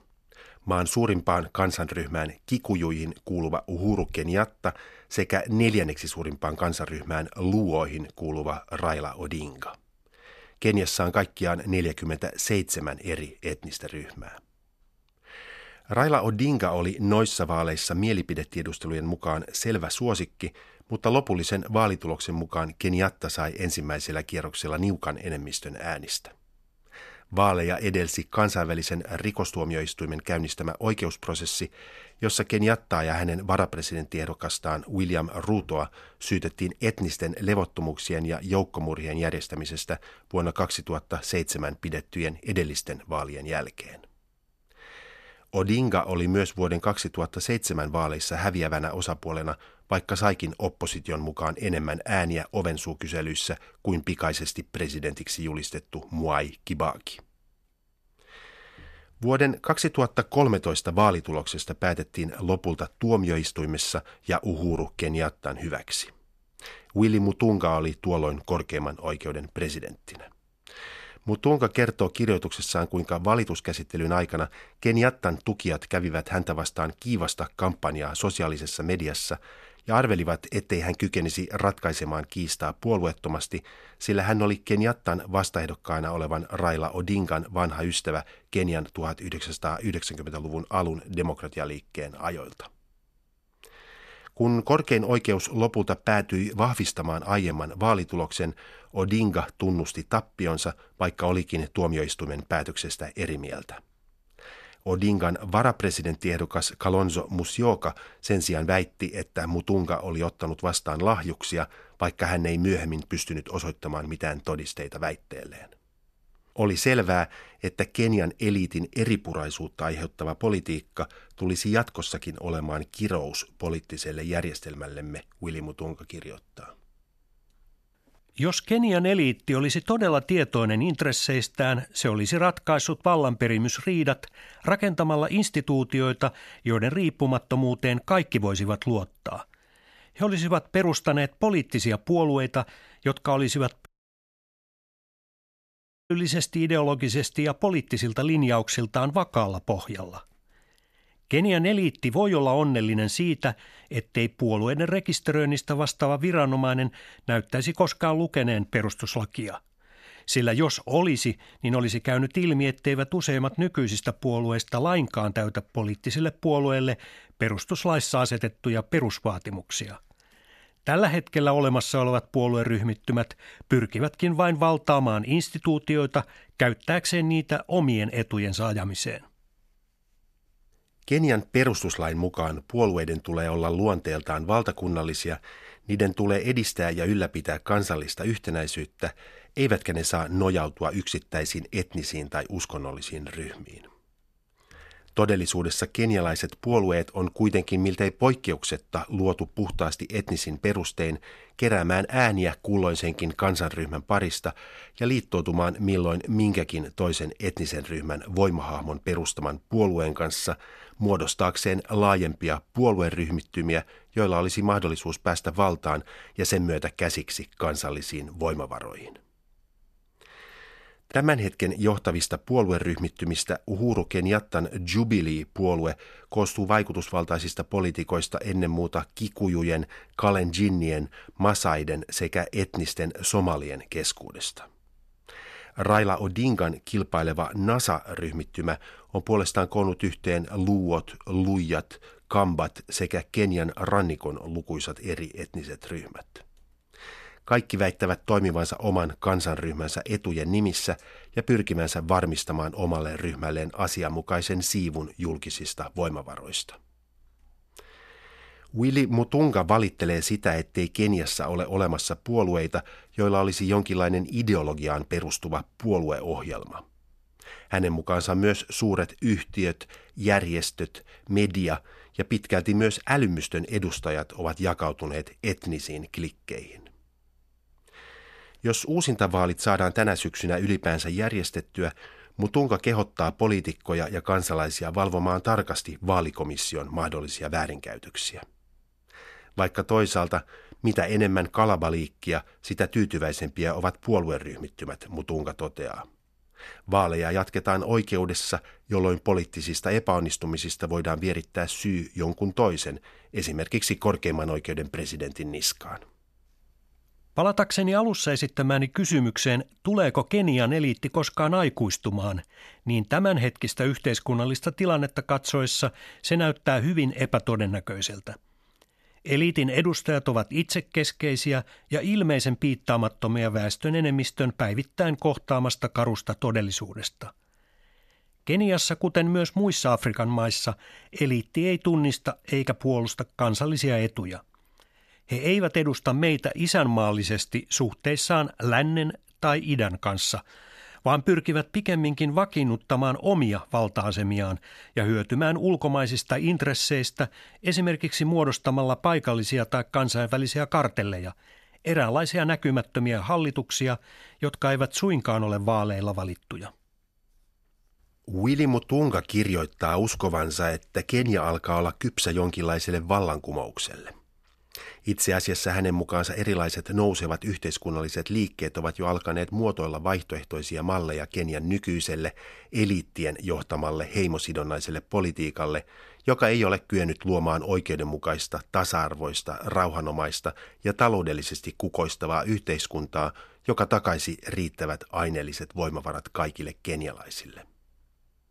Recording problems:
audio cutting out; at 2:24 for 2 s

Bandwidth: 13.5 kHz